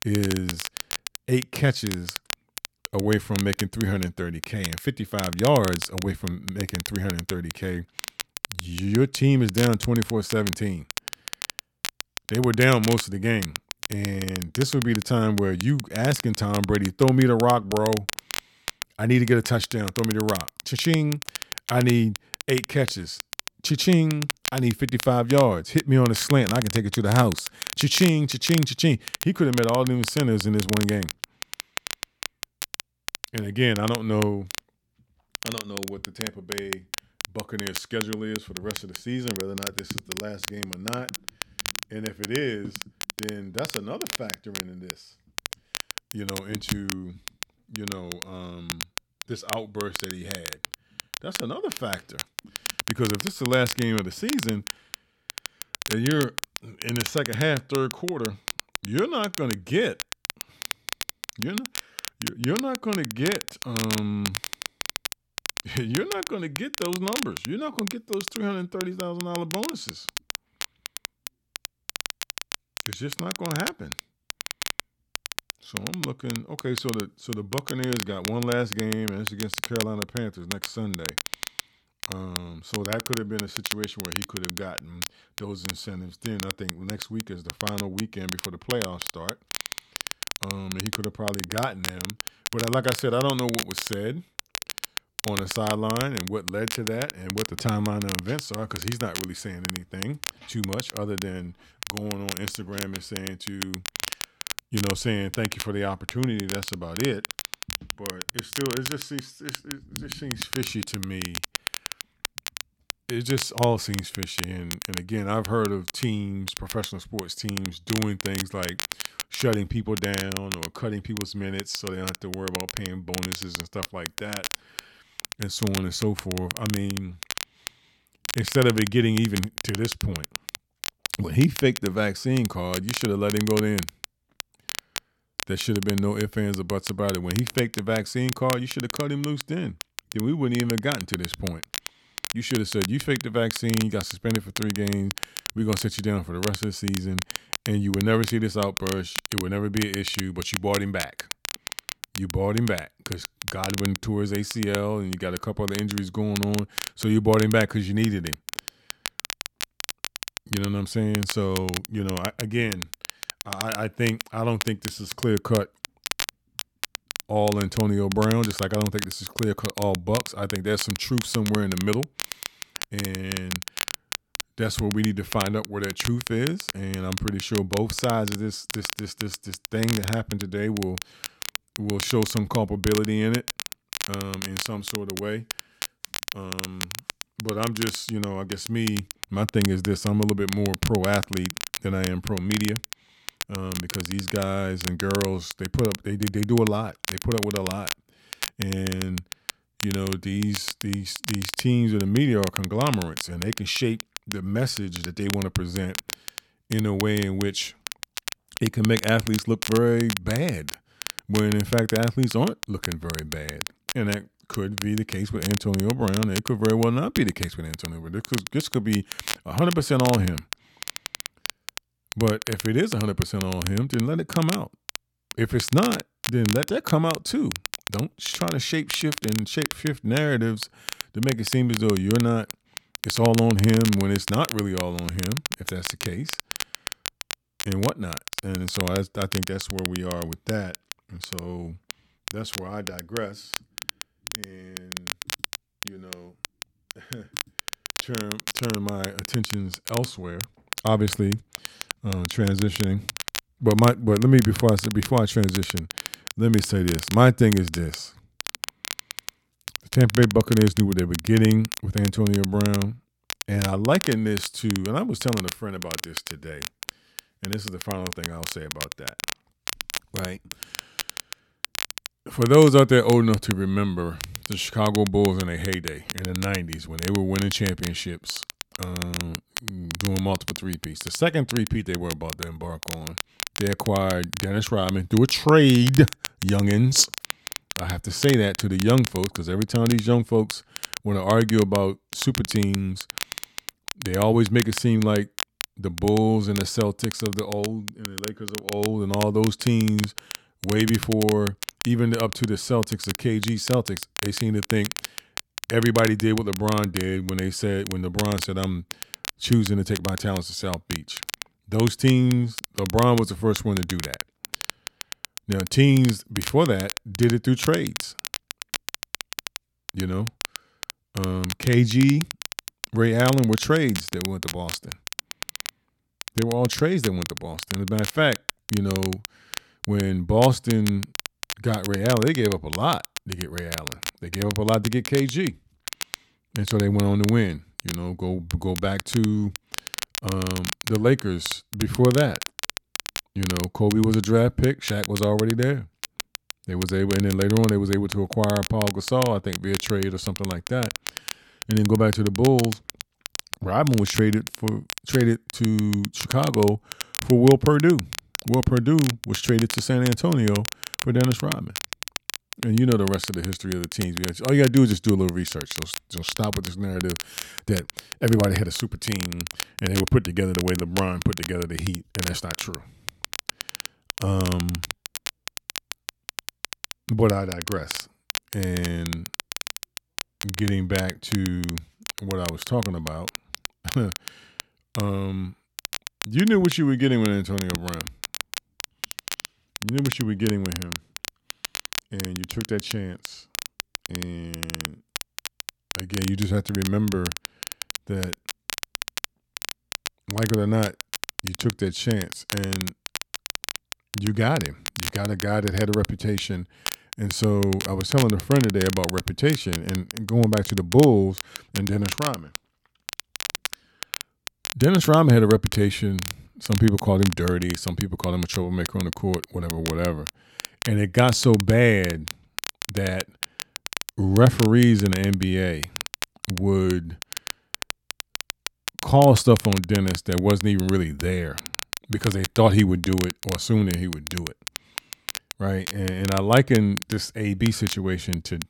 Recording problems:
crackle, like an old record; loud; 9 dB below the speech

